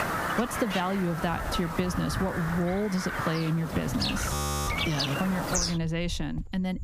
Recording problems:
squashed, flat; somewhat
animal sounds; loud; throughout; 2 dB below the speech
audio freezing; at 4.5 s

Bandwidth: 15 kHz